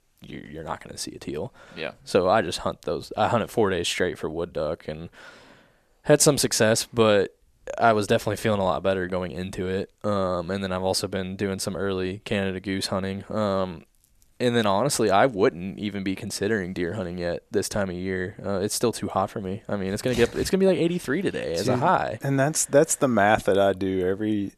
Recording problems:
none

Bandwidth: 13.5 kHz